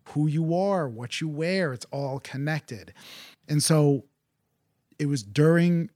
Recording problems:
none

